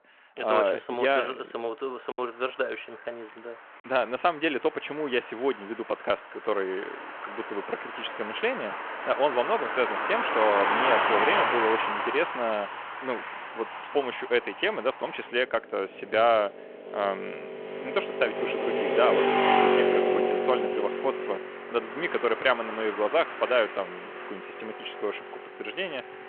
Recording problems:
phone-call audio
traffic noise; loud; throughout; as loud as the speech
choppy; occasionally; at 2 s; 2% of the speech affected

